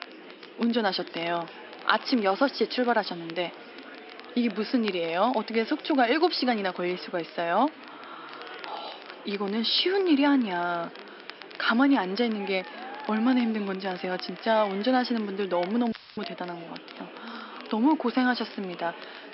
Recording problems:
high frequencies cut off; noticeable; nothing above 5.5 kHz
thin; very slightly; fading below 300 Hz
murmuring crowd; noticeable; throughout; 15 dB below the speech
crackle, like an old record; faint; 20 dB below the speech
audio cutting out; filled with static; at 16 s

